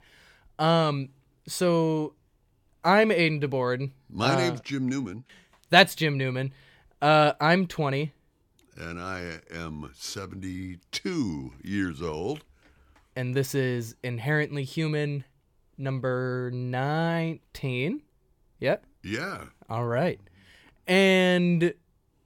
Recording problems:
none

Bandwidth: 17 kHz